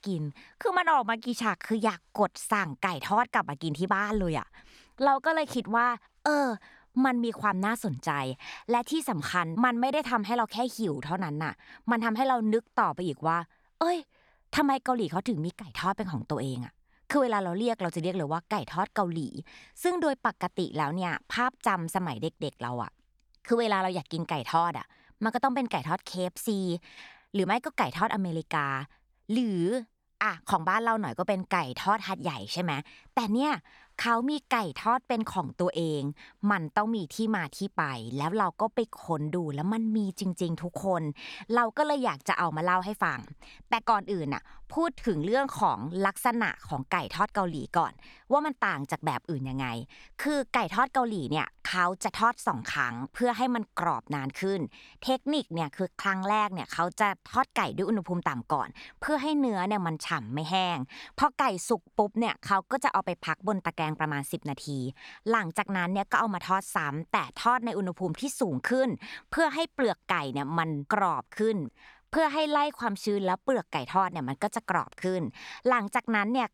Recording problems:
none

